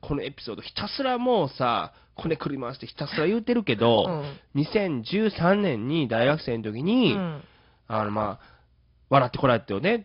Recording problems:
garbled, watery; slightly; nothing above 5 kHz
high frequencies cut off; slight

